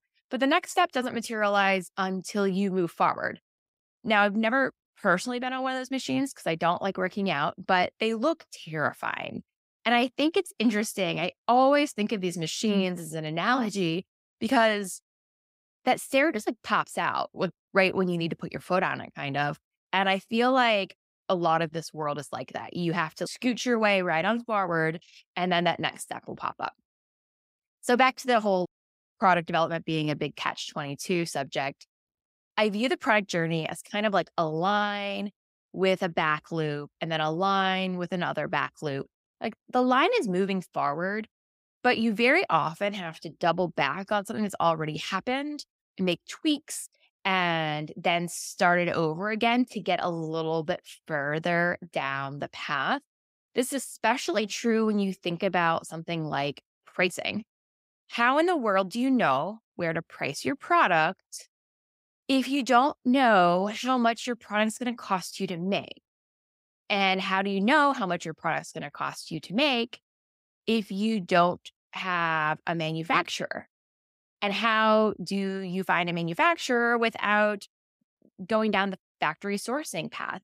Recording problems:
none

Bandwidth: 15.5 kHz